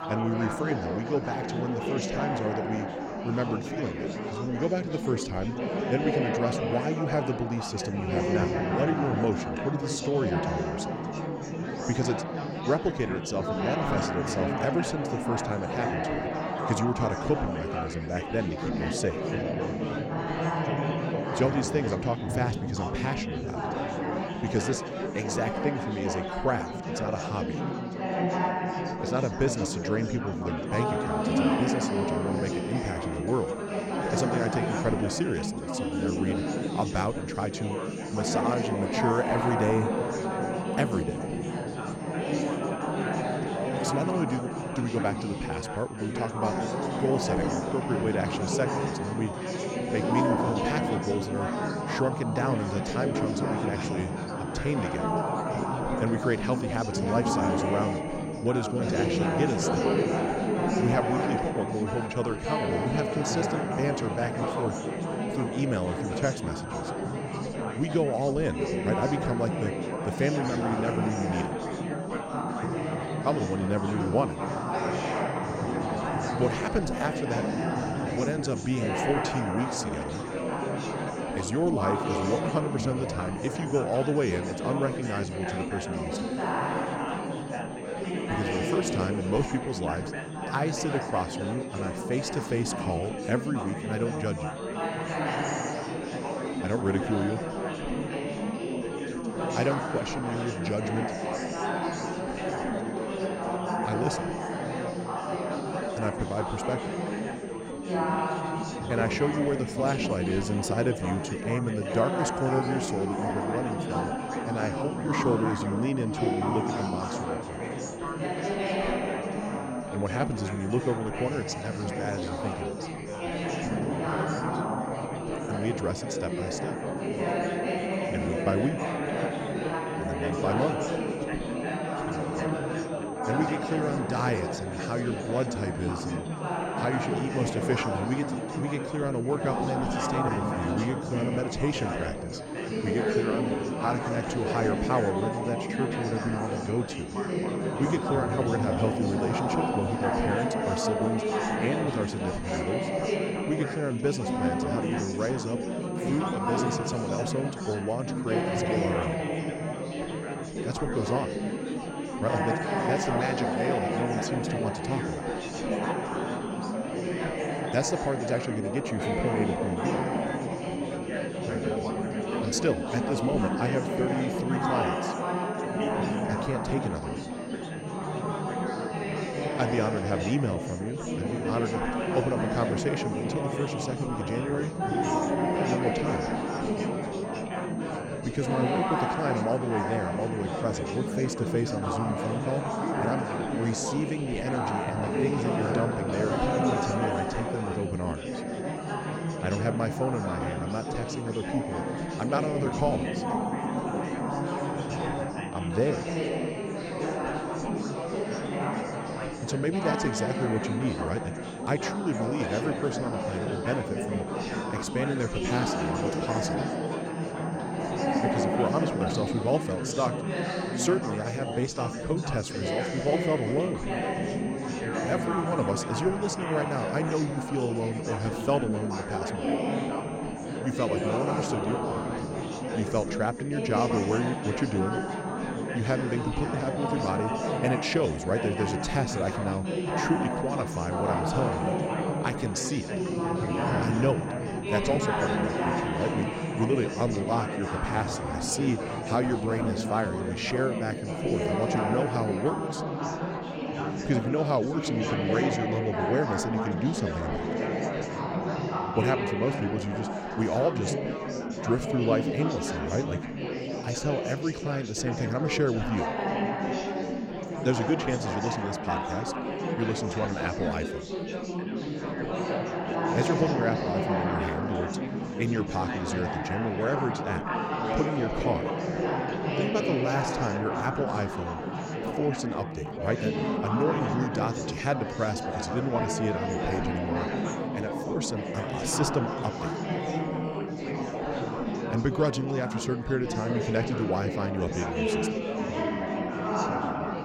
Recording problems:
chatter from many people; very loud; throughout; as loud as the speech
high-pitched whine; faint; from 31 s to 4:13; 8.5 kHz, 20 dB below the speech

